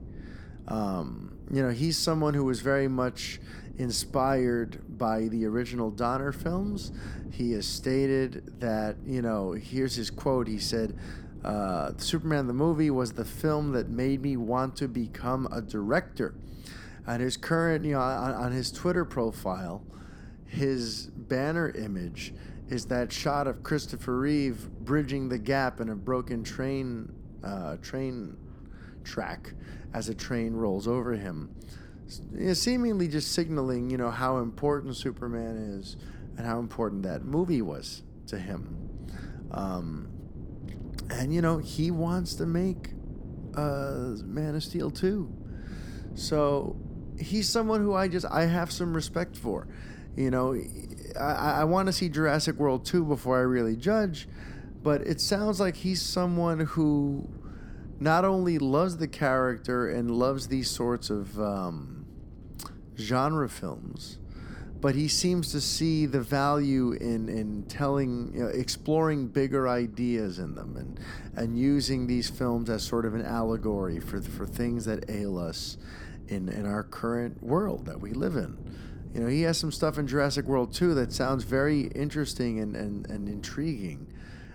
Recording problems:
wind noise on the microphone; occasional gusts; 20 dB below the speech

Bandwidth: 18 kHz